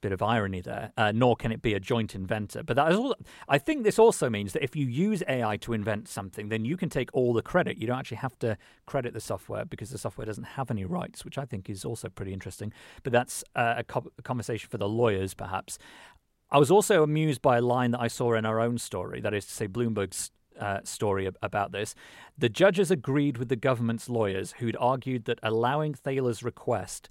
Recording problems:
none

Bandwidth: 16 kHz